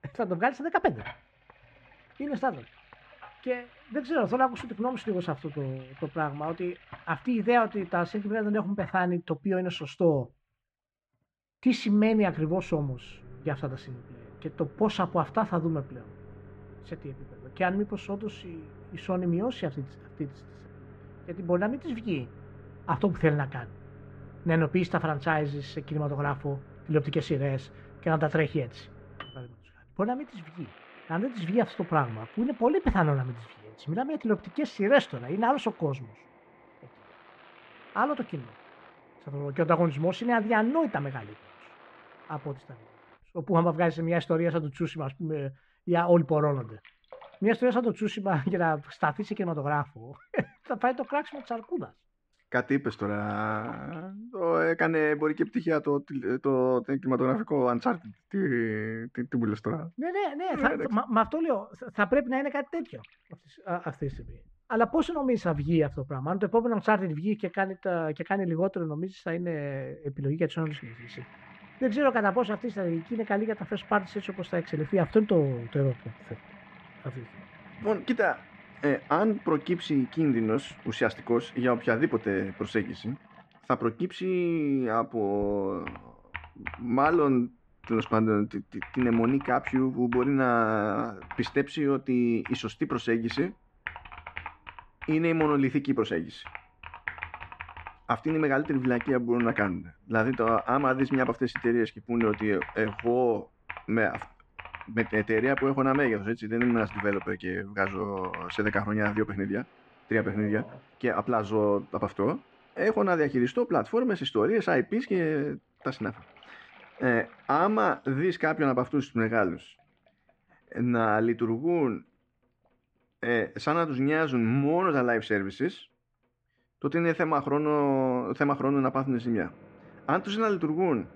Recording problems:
muffled; very; fading above 2 kHz
household noises; noticeable; throughout; 20 dB below the speech

